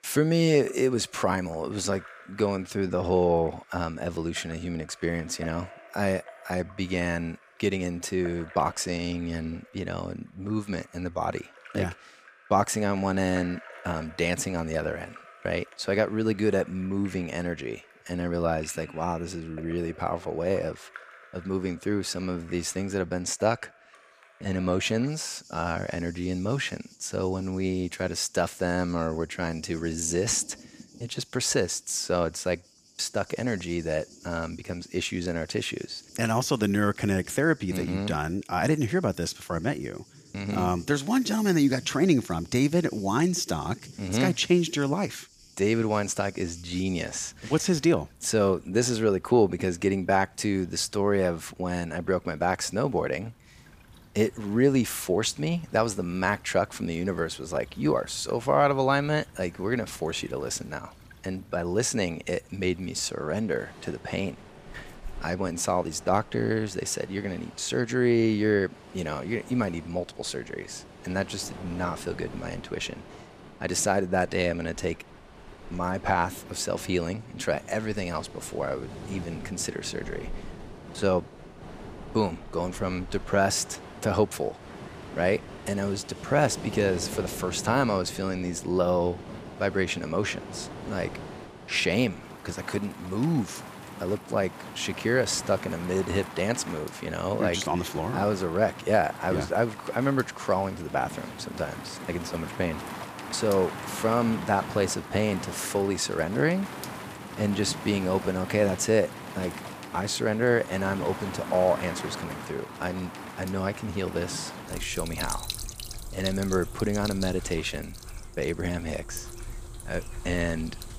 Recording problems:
rain or running water; noticeable; throughout; 15 dB below the speech

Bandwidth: 15 kHz